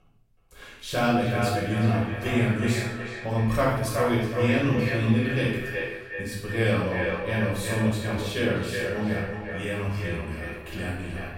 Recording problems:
echo of what is said; strong; throughout; 370 ms later, 6 dB below the speech
off-mic speech; far
room echo; noticeable; dies away in 0.8 s

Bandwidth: 16 kHz